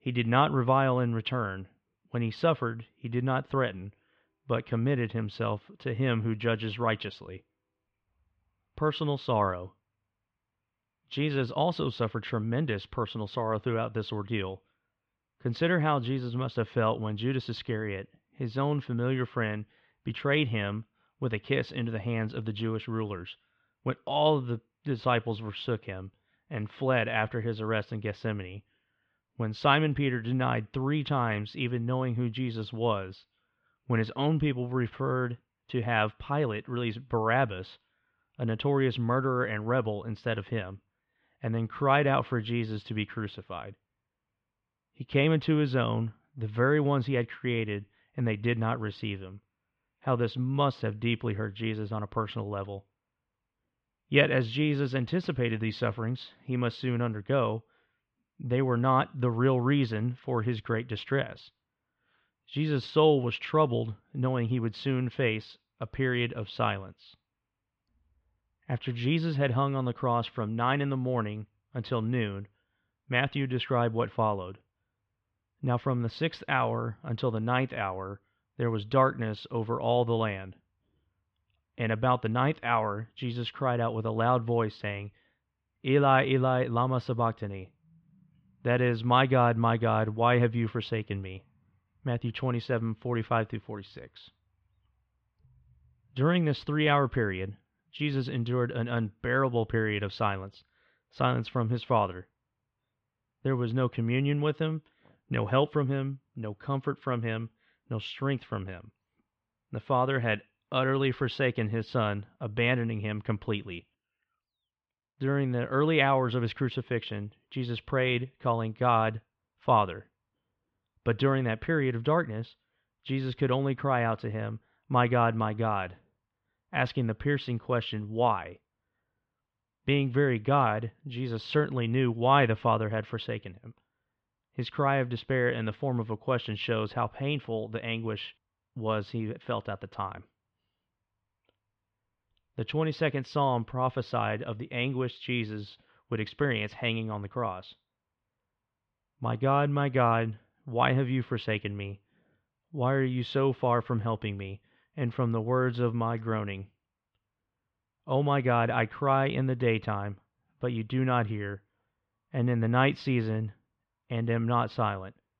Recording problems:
muffled; slightly; fading above 3 kHz

